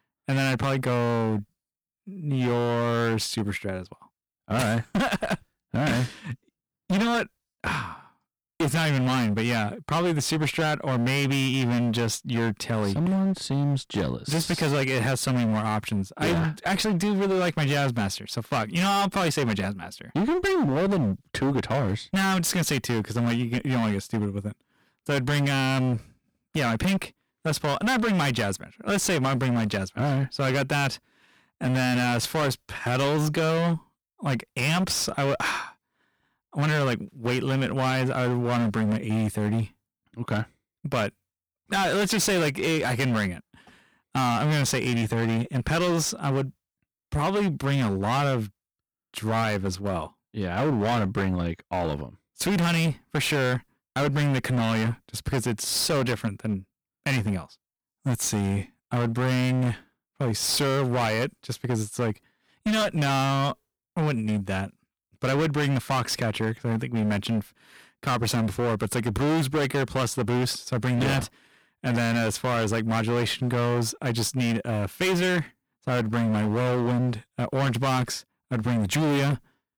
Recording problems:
distortion; heavy; 25% of the sound clipped

